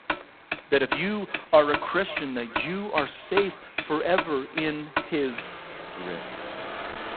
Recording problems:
phone-call audio; poor line; nothing above 4 kHz
echo of what is said; faint; throughout; 550 ms later, 20 dB below the speech
traffic noise; loud; throughout; 7 dB below the speech

